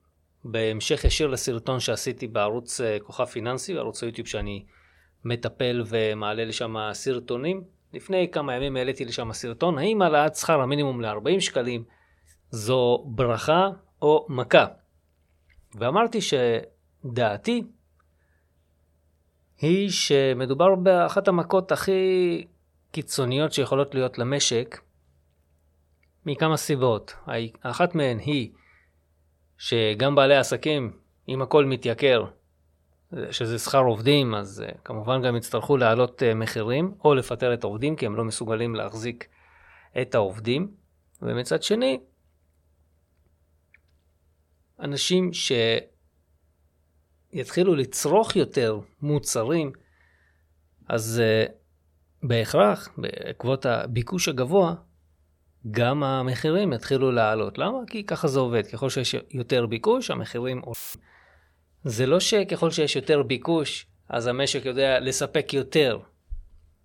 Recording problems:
audio cutting out; filled with static; at 1:01

